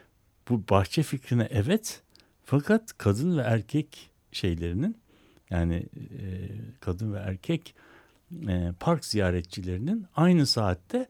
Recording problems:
none

